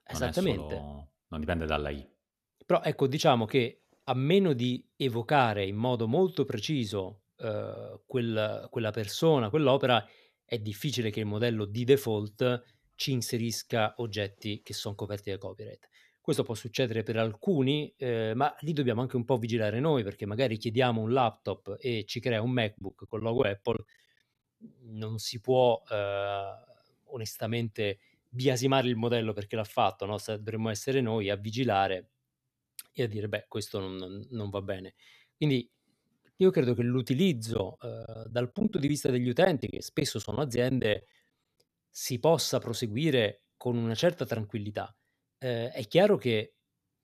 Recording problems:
choppy; very; from 23 to 24 s and from 38 to 41 s; 10% of the speech affected

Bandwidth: 14 kHz